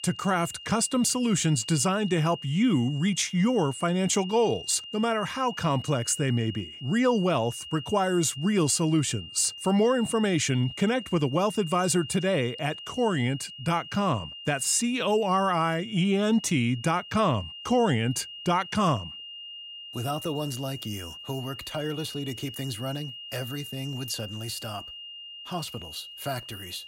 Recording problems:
high-pitched whine; noticeable; throughout; 3 kHz, 15 dB below the speech

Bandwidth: 16 kHz